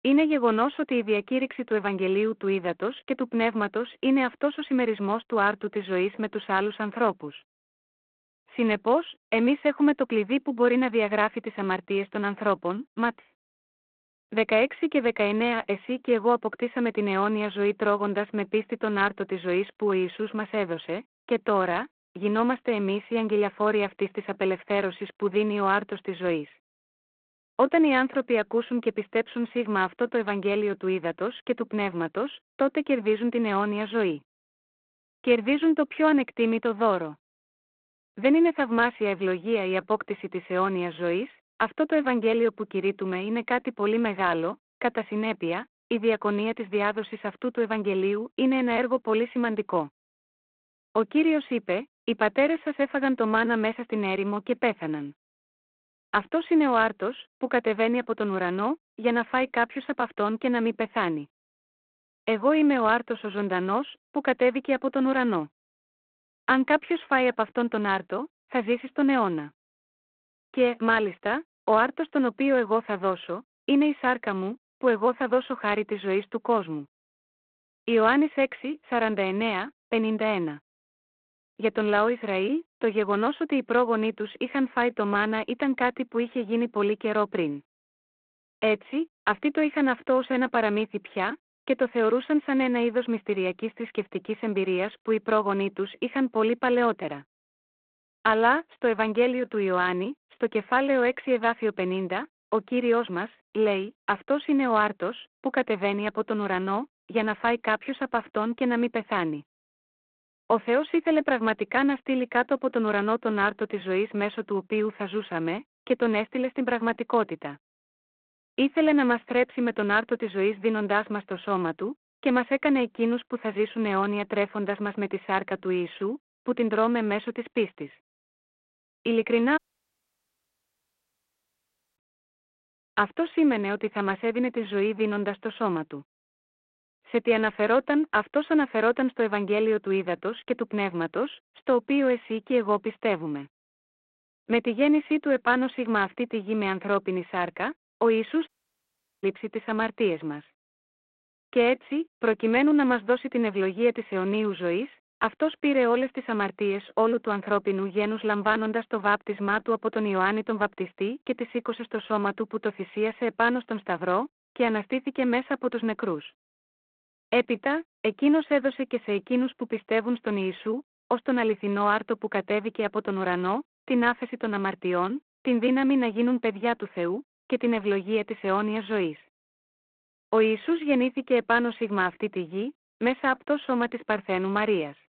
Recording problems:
phone-call audio
audio cutting out; at 2:10 for 2.5 s and at 2:28 for 1 s

